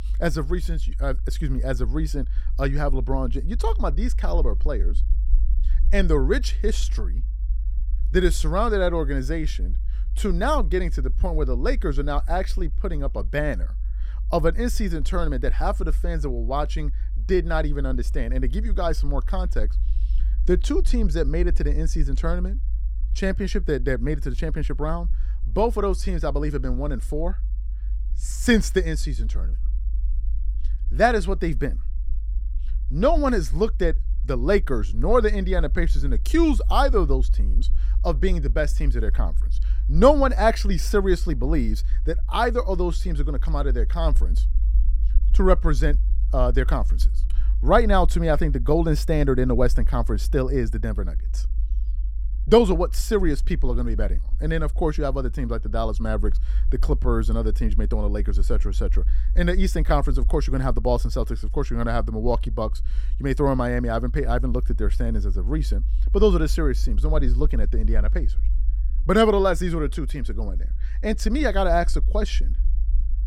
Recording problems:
low rumble; faint; throughout; 25 dB below the speech

